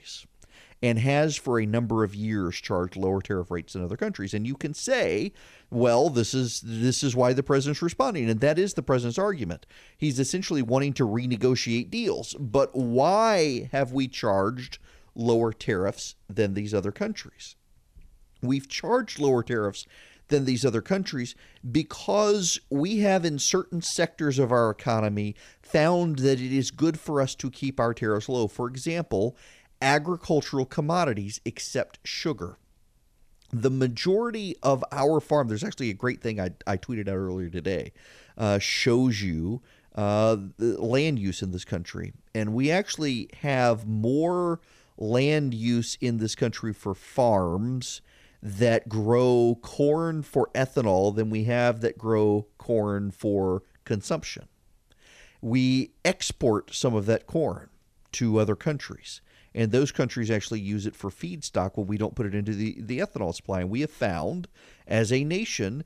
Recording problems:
none

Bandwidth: 14.5 kHz